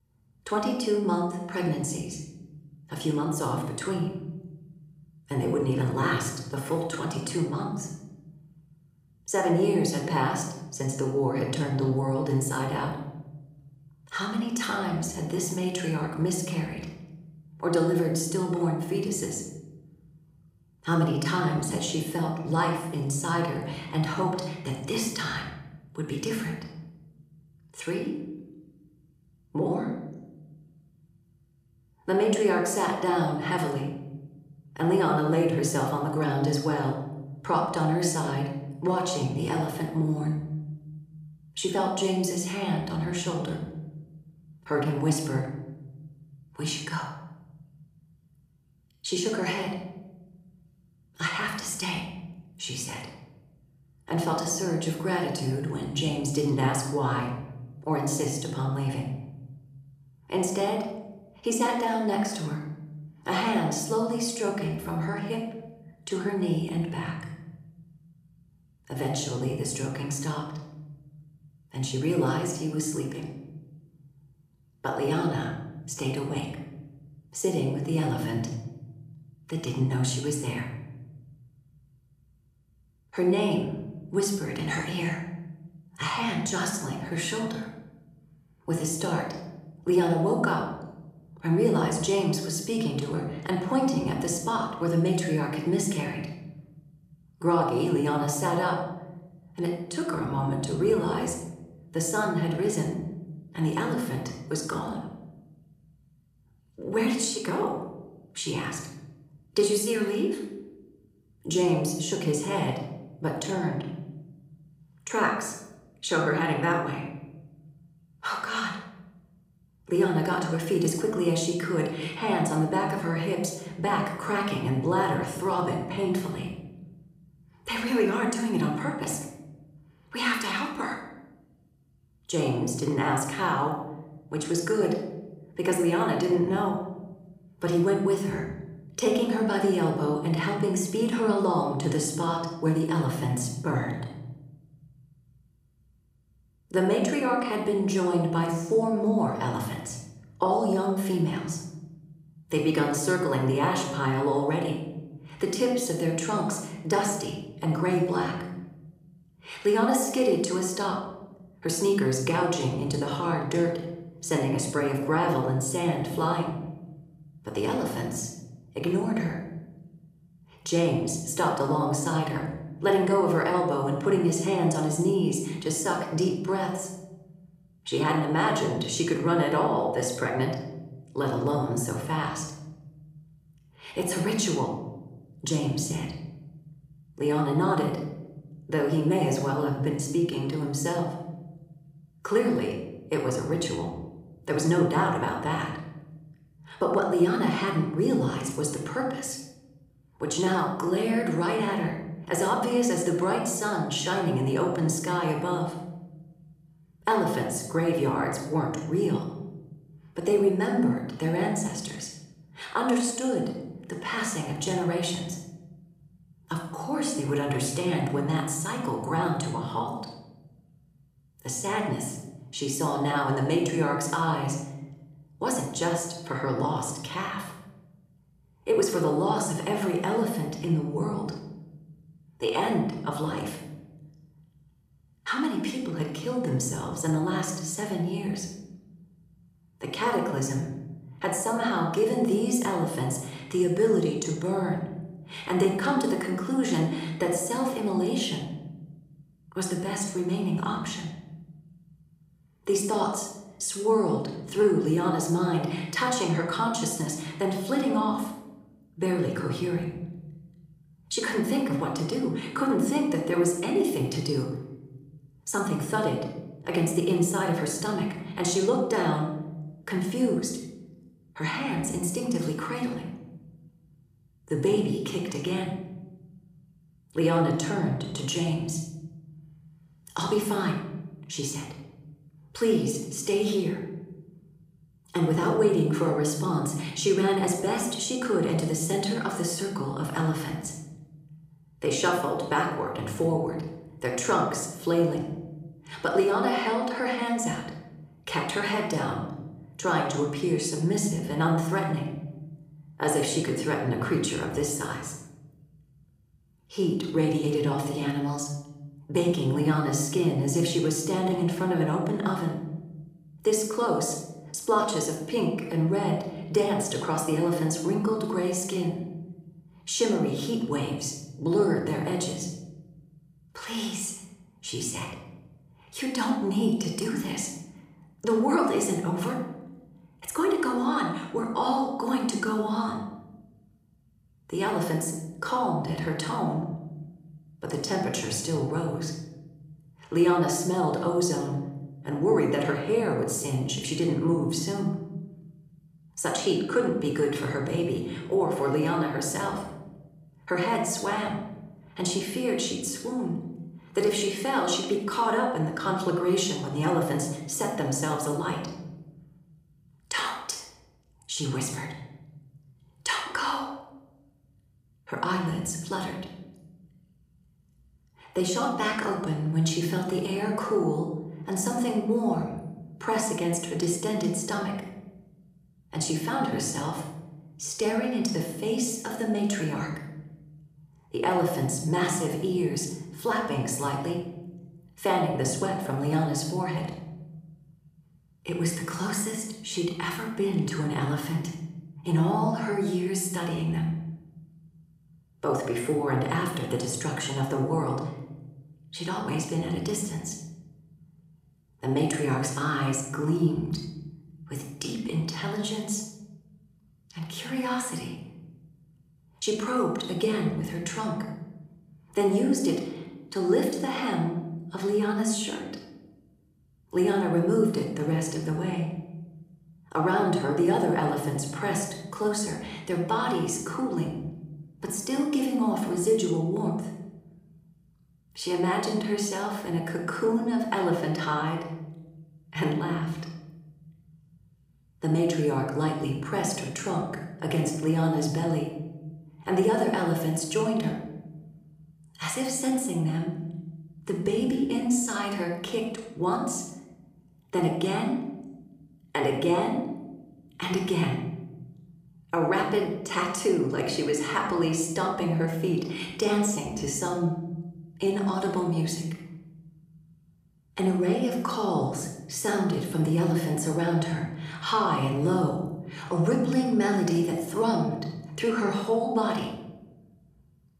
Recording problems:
room echo; noticeable; dies away in 0.9 s
off-mic speech; somewhat distant

